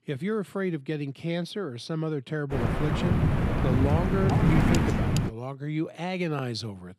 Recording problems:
wind noise on the microphone; heavy; from 2.5 to 5.5 s; 3 dB above the speech

